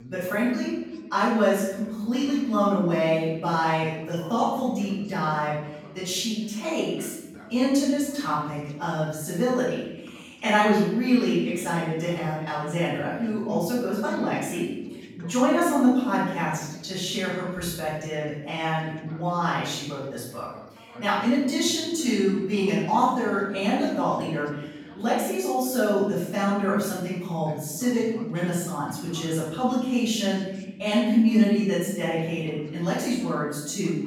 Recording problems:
room echo; strong; dies away in 0.9 s
off-mic speech; far
background chatter; faint; throughout; 2 voices, 25 dB below the speech

